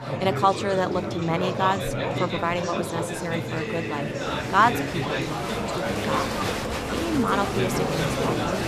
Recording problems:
chatter from many people; loud; throughout; 1 dB below the speech

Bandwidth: 14.5 kHz